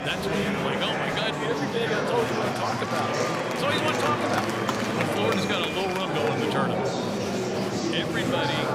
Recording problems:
murmuring crowd; very loud; throughout; 3 dB above the speech

